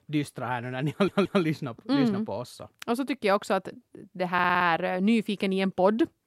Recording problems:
audio stuttering; at 1 s and at 4.5 s

